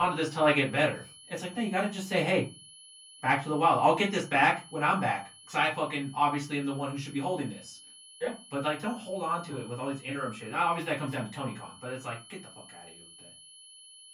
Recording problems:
off-mic speech; far
room echo; very slight; dies away in 0.2 s
high-pitched whine; faint; throughout; 3 kHz, 20 dB below the speech
abrupt cut into speech; at the start

